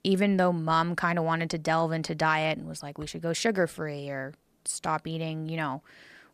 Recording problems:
none

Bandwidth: 14.5 kHz